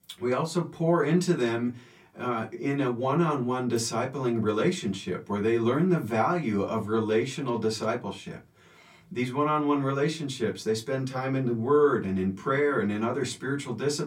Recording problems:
off-mic speech; far
room echo; very slight; dies away in 0.2 s

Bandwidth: 16.5 kHz